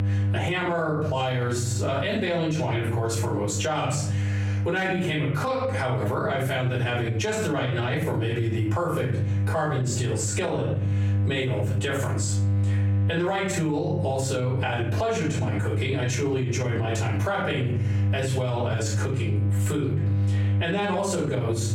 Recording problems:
off-mic speech; far
squashed, flat; heavily
room echo; noticeable; dies away in 0.4 s
electrical hum; noticeable; throughout; 50 Hz, 15 dB below the speech

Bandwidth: 16 kHz